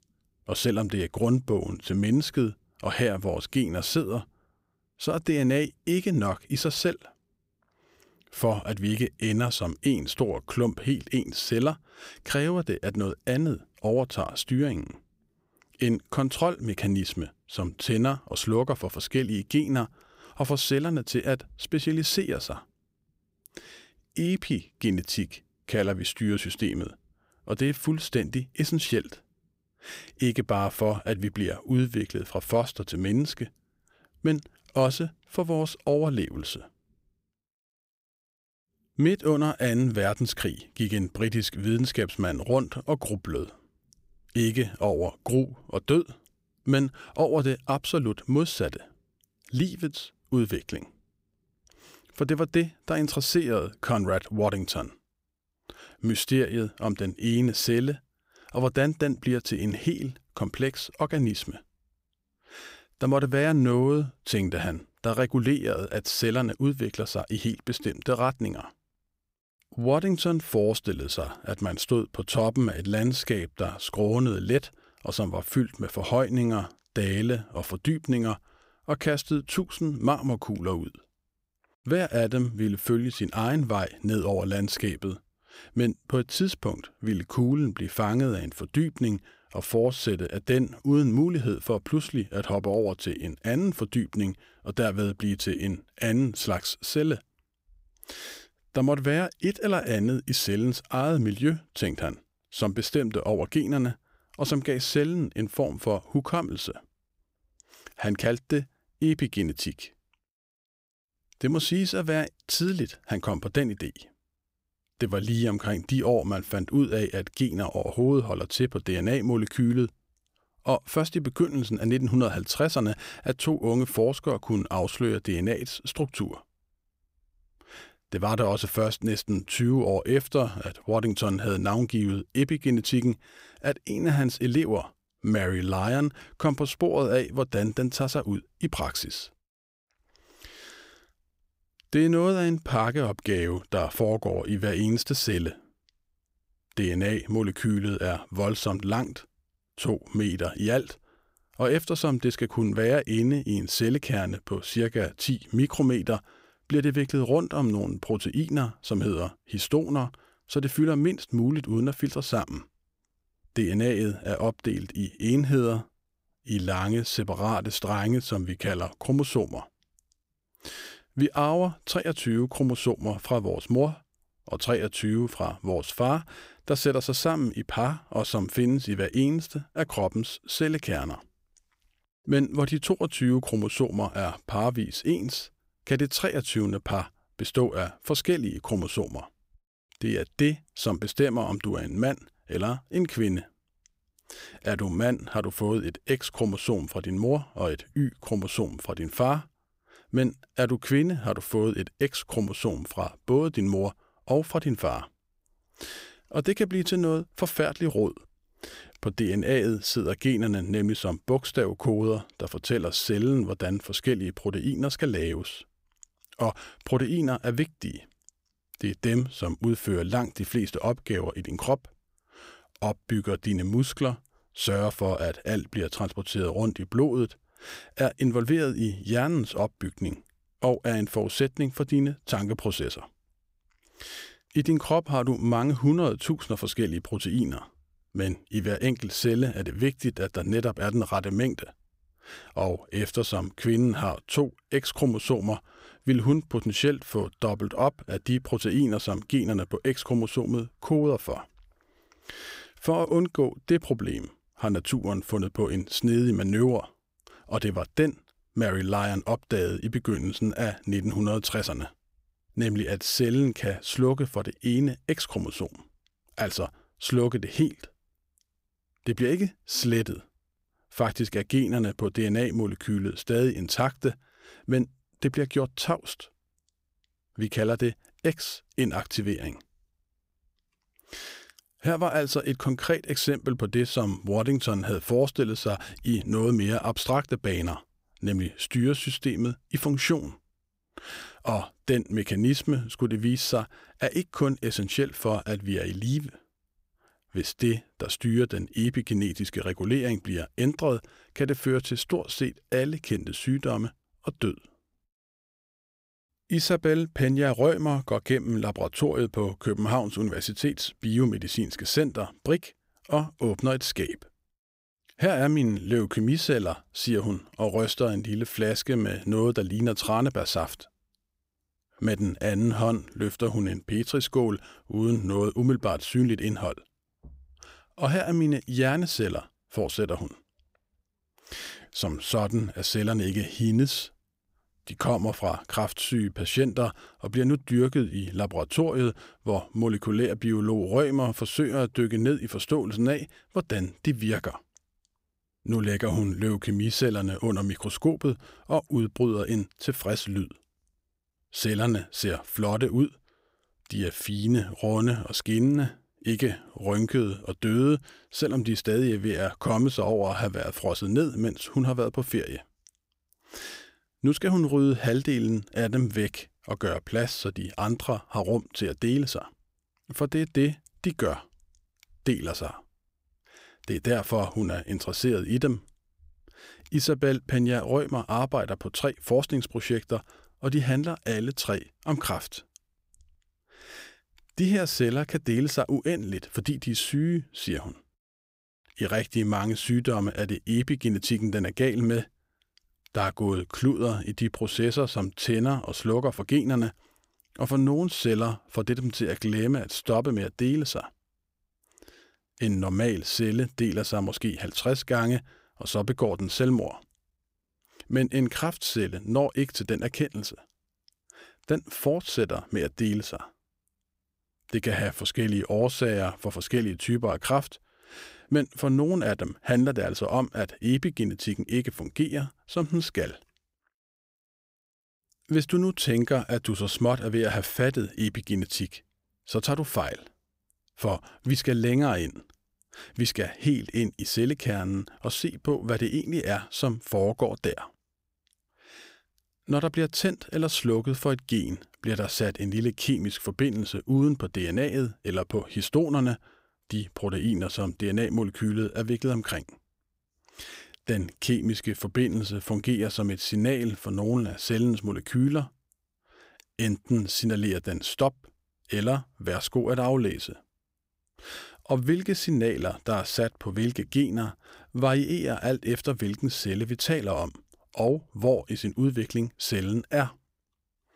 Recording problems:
none

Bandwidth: 15.5 kHz